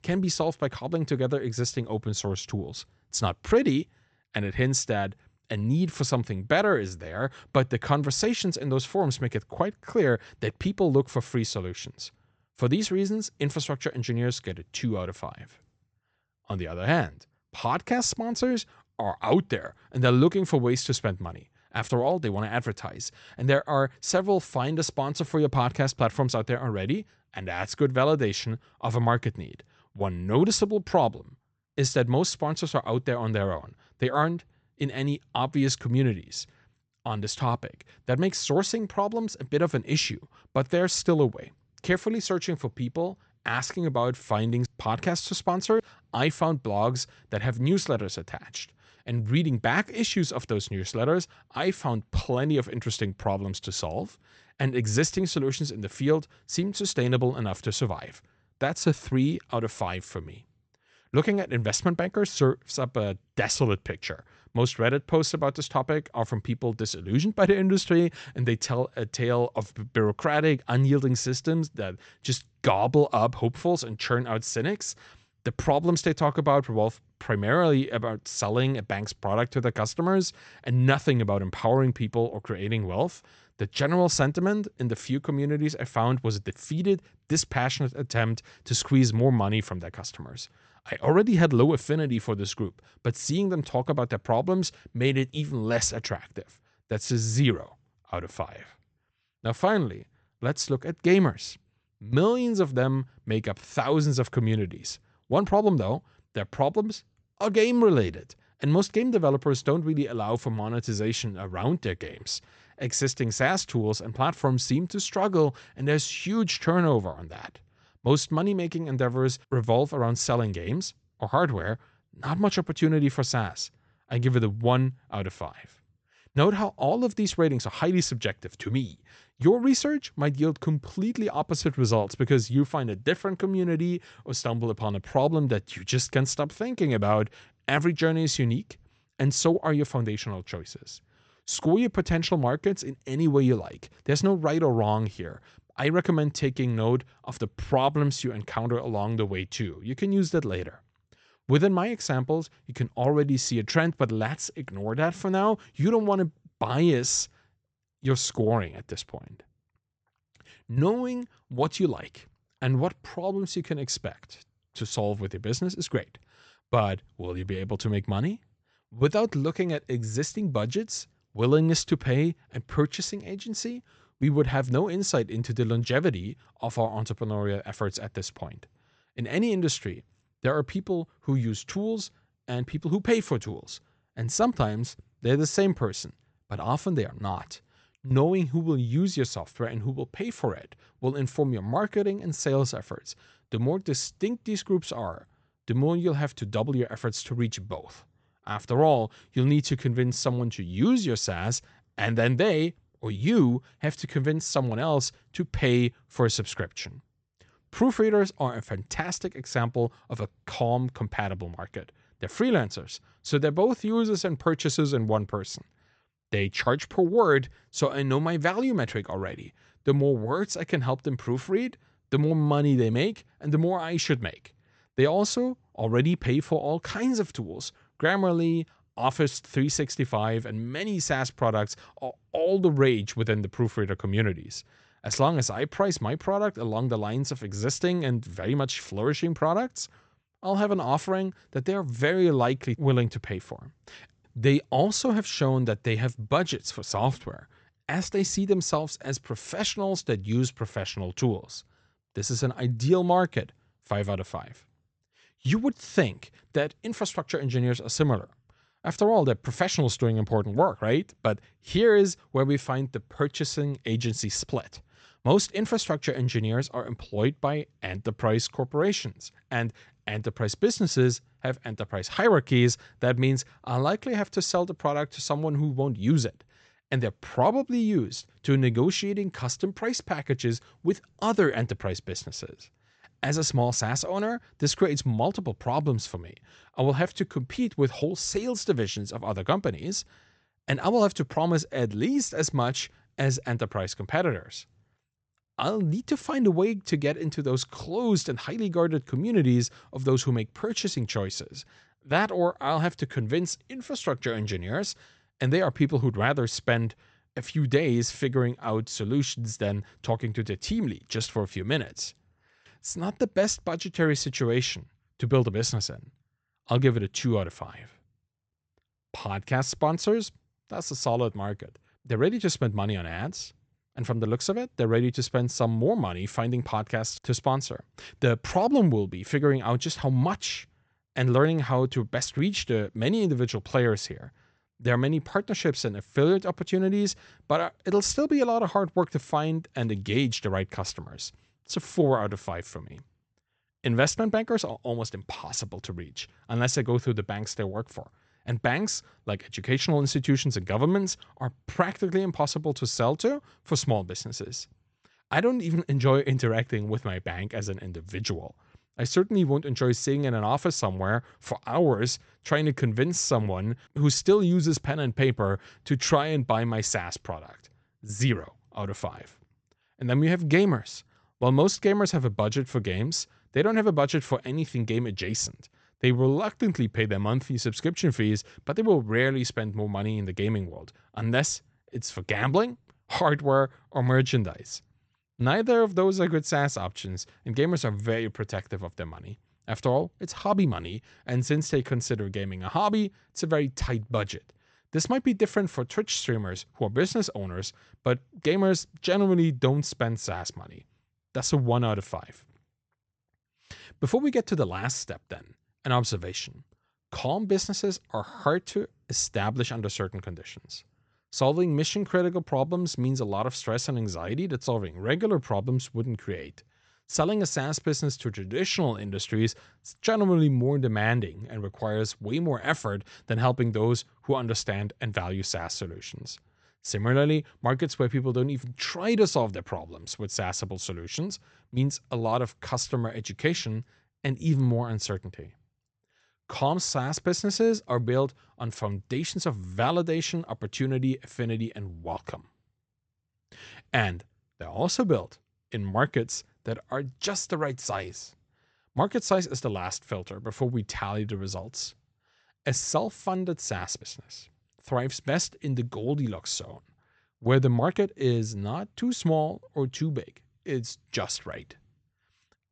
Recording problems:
high frequencies cut off; noticeable; nothing above 8 kHz

